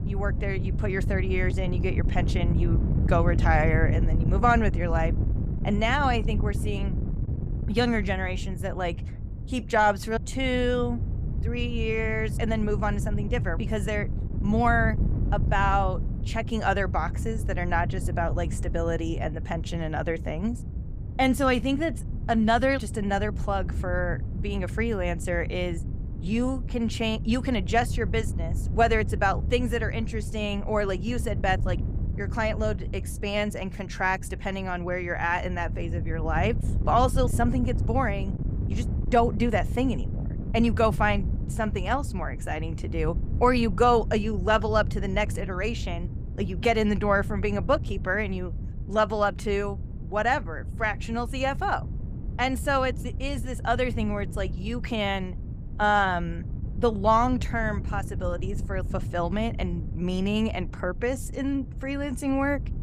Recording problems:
wind noise on the microphone; occasional gusts; 15 dB below the speech

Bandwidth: 15.5 kHz